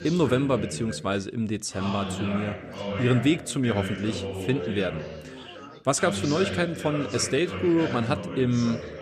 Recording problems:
background chatter; loud; throughout; 4 voices, 7 dB below the speech

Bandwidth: 14 kHz